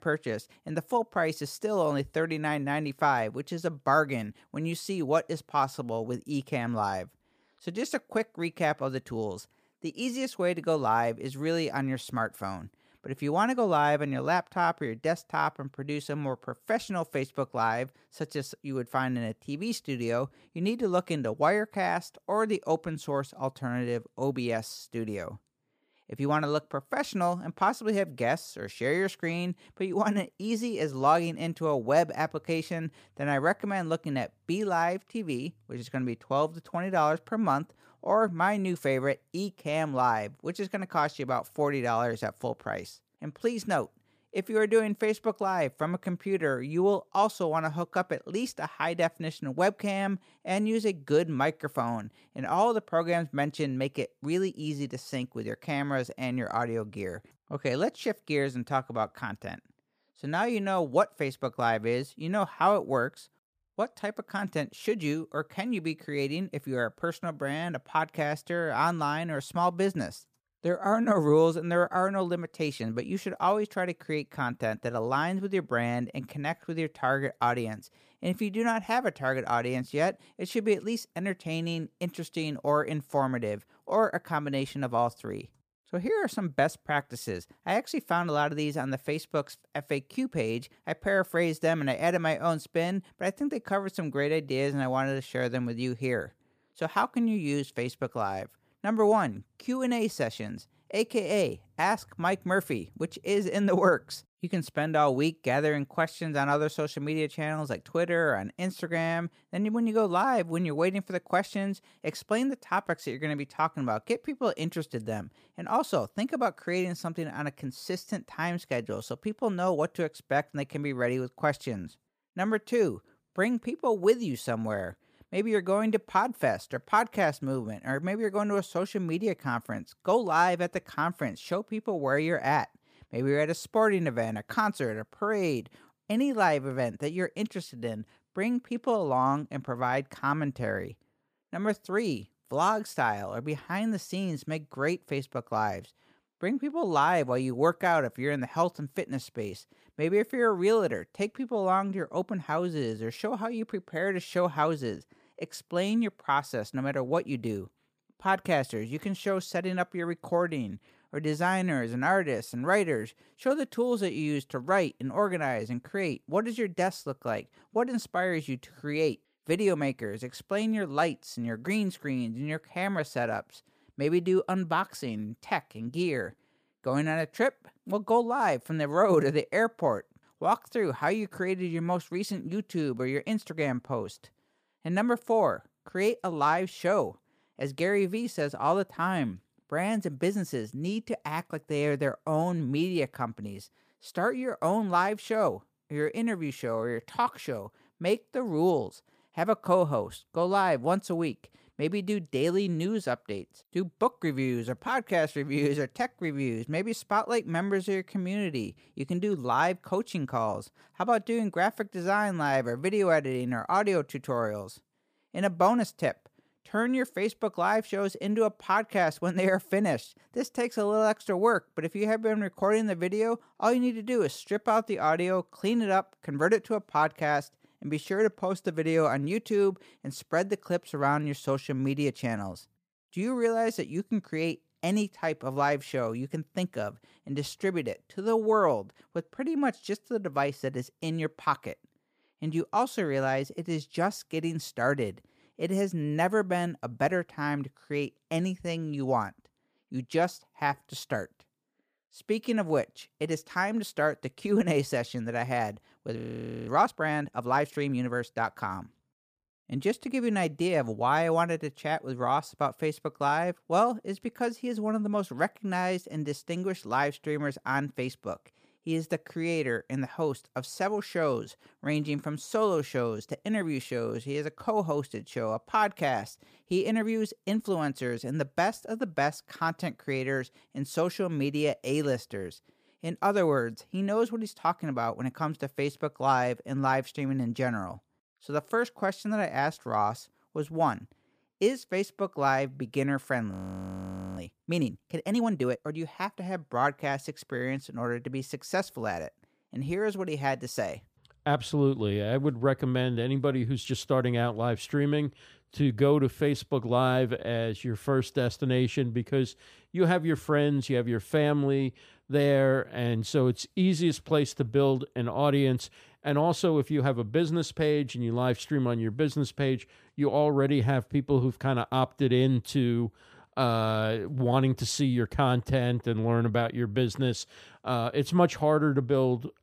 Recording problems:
audio freezing; at 4:16 and at 4:54 for 1 s

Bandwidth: 15 kHz